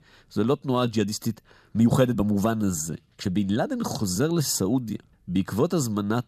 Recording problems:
uneven, jittery; strongly; from 0.5 to 5.5 s

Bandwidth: 14.5 kHz